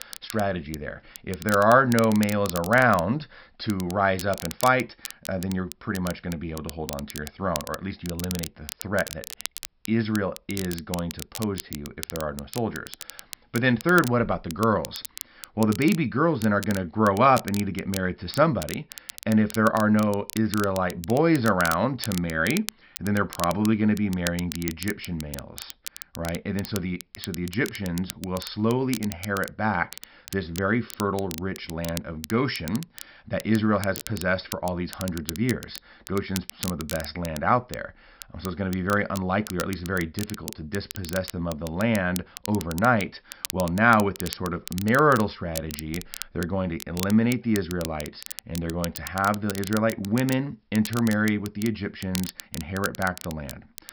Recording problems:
high frequencies cut off; noticeable; nothing above 5.5 kHz
crackle, like an old record; noticeable; 10 dB below the speech

